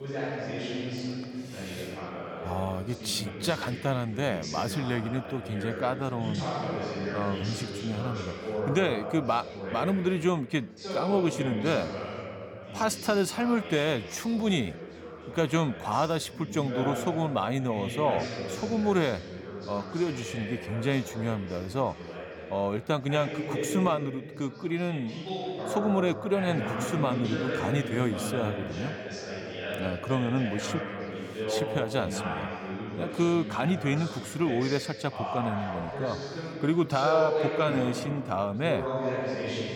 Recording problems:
background chatter; loud; throughout; 4 voices, 5 dB below the speech

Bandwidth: 17.5 kHz